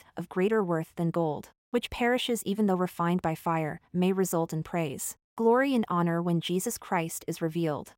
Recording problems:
none

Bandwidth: 16 kHz